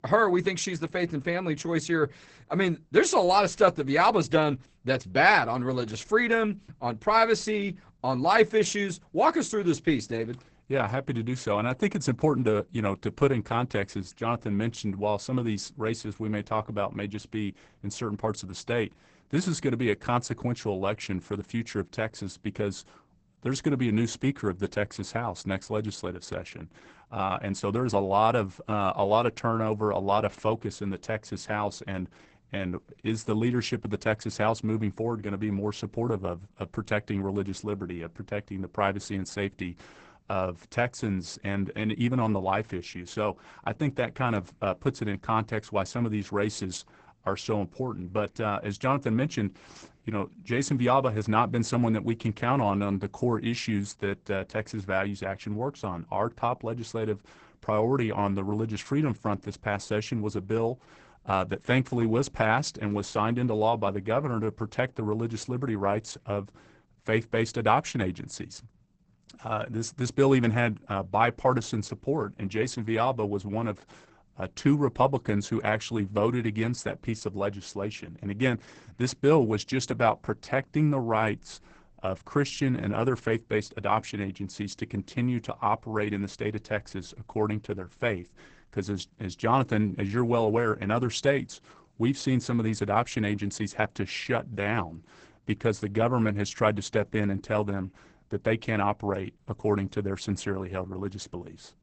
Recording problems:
garbled, watery; badly; nothing above 8 kHz

